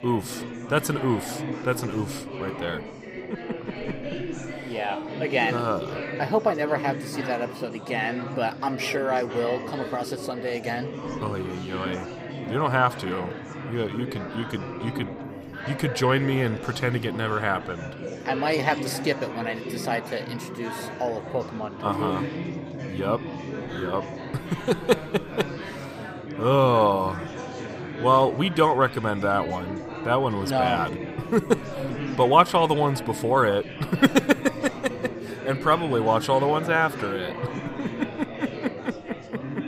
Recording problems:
chatter from many people; loud; throughout; 9 dB below the speech

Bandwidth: 15 kHz